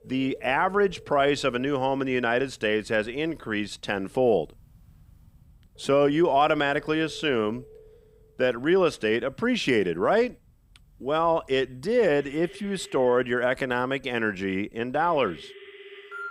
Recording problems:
alarms or sirens; faint; throughout; 25 dB below the speech

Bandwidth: 15.5 kHz